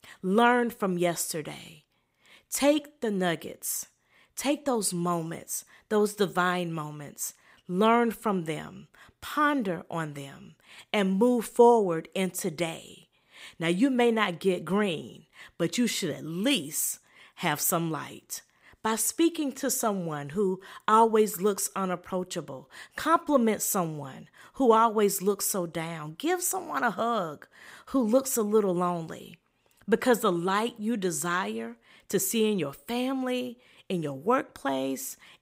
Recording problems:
none

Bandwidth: 15.5 kHz